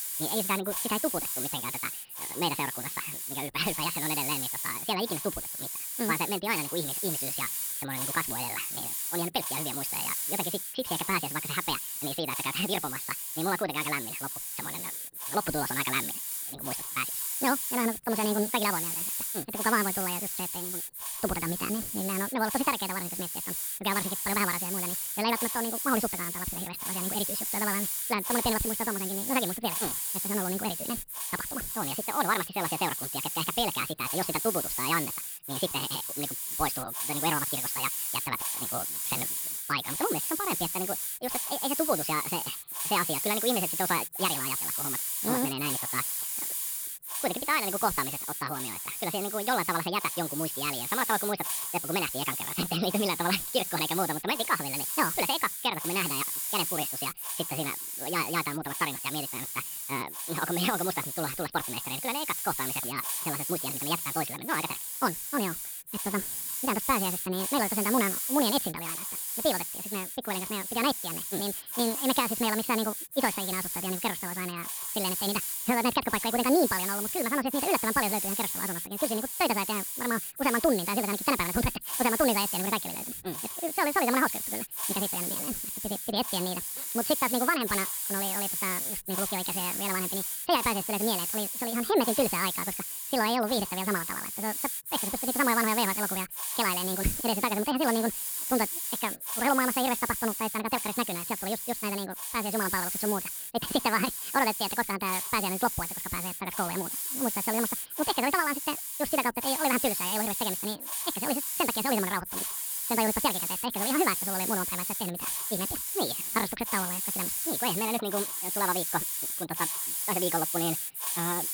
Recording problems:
wrong speed and pitch; too fast and too high; 1.7 times normal speed
high frequencies cut off; noticeable; nothing above 5.5 kHz
hiss; loud; throughout; as loud as the speech

